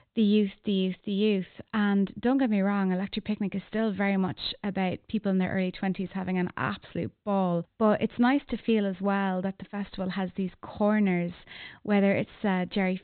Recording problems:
high frequencies cut off; severe; nothing above 4 kHz

